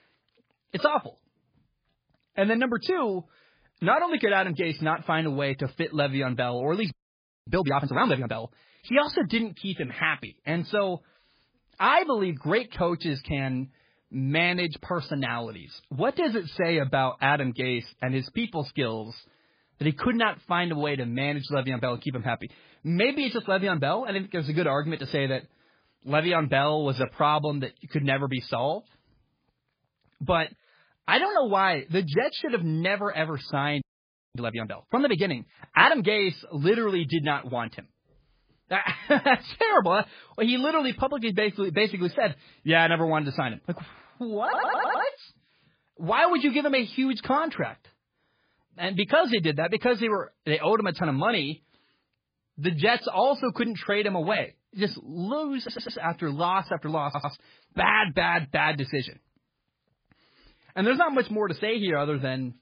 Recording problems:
garbled, watery; badly; nothing above 4 kHz
audio freezing; at 7 s for 0.5 s and at 34 s for 0.5 s
audio stuttering; at 44 s, at 56 s and at 57 s

